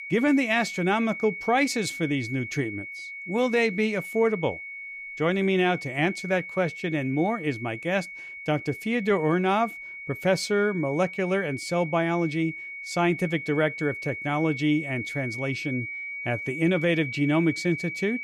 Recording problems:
high-pitched whine; loud; throughout; 2 kHz, 9 dB below the speech

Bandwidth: 15 kHz